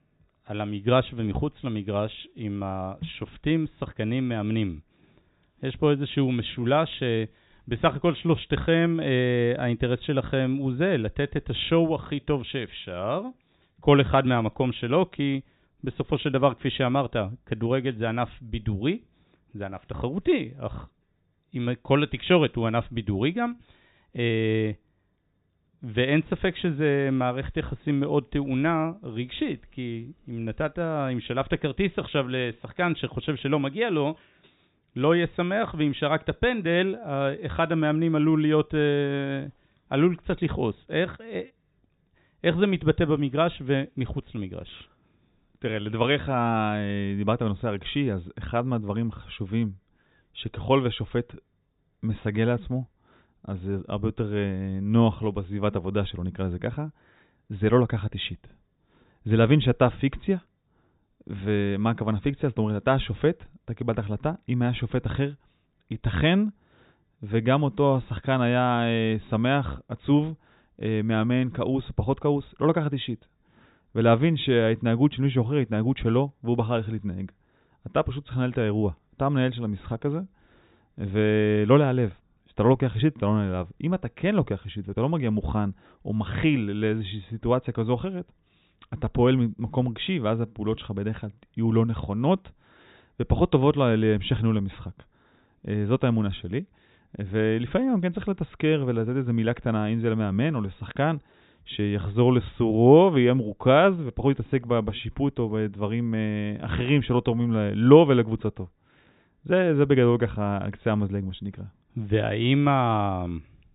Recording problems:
high frequencies cut off; severe; nothing above 4 kHz

